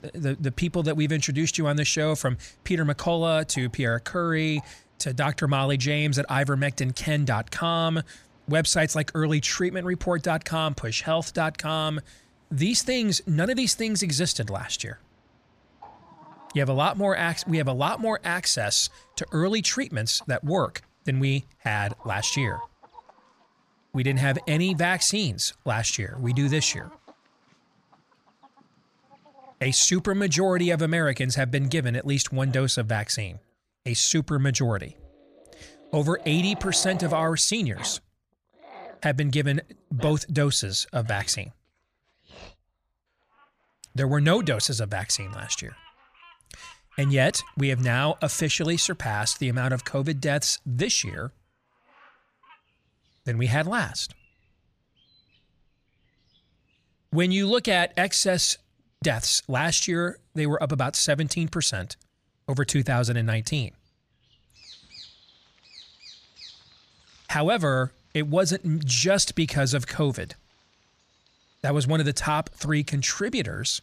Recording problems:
animal sounds; faint; throughout; 25 dB below the speech

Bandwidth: 15 kHz